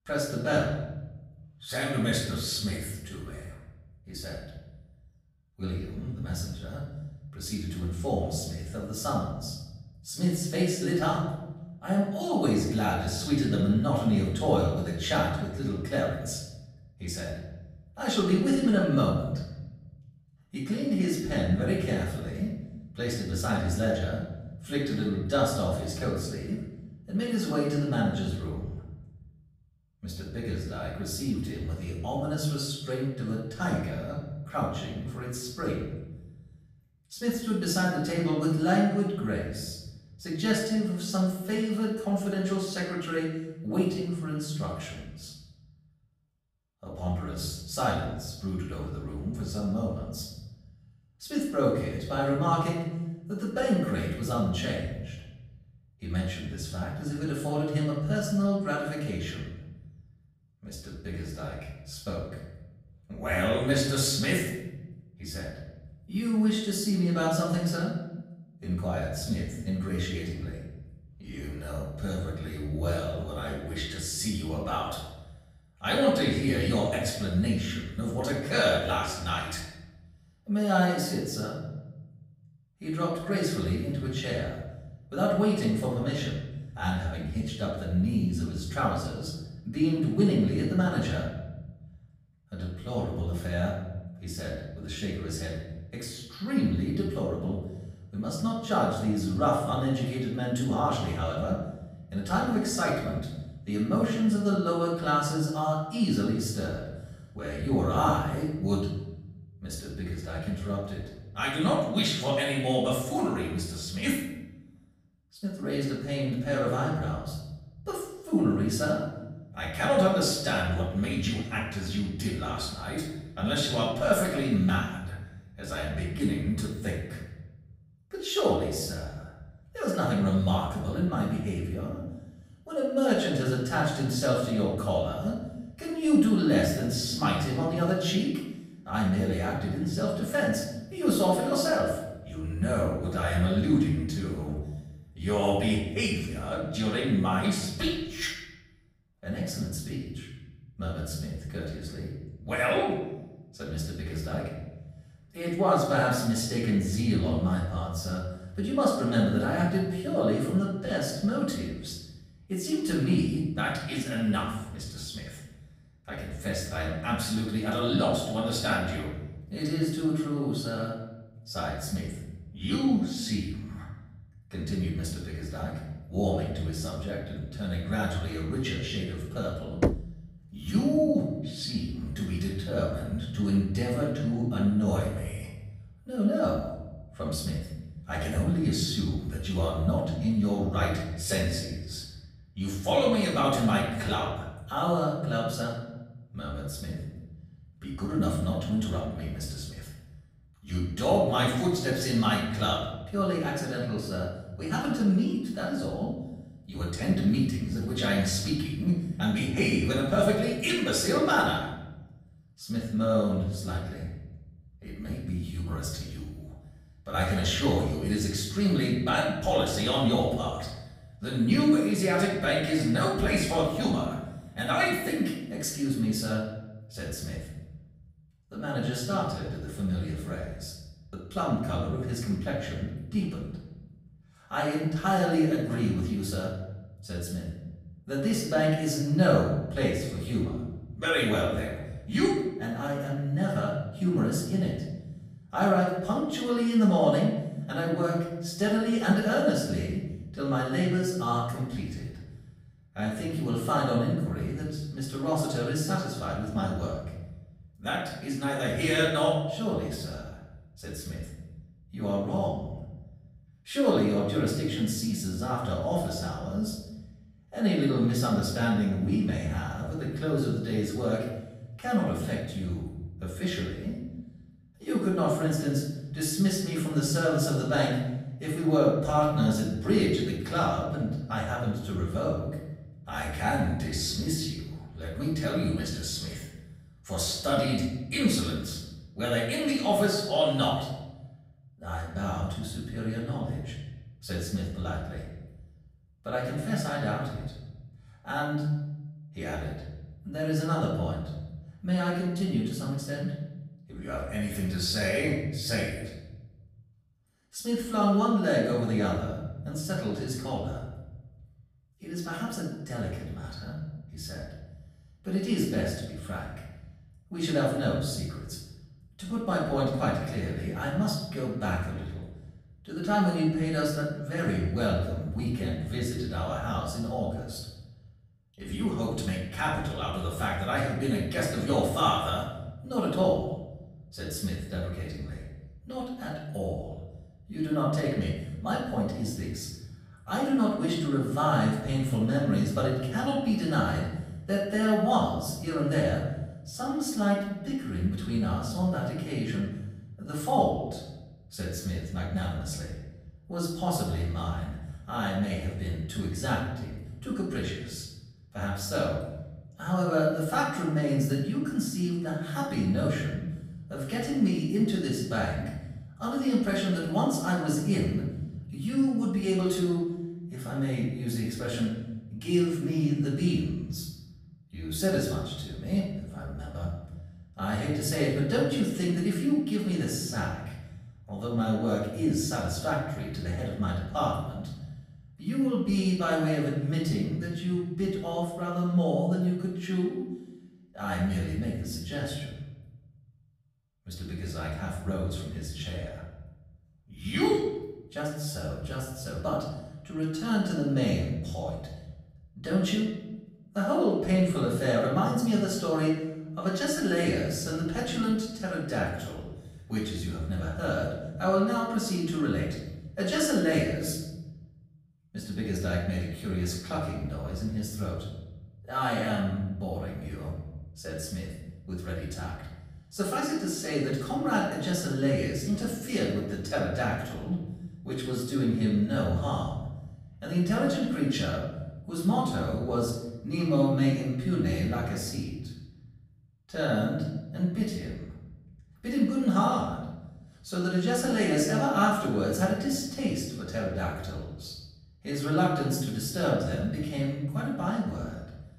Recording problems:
off-mic speech; far
room echo; noticeable; dies away in 1.2 s
door banging; loud; at 3:00; peak 1 dB above the speech

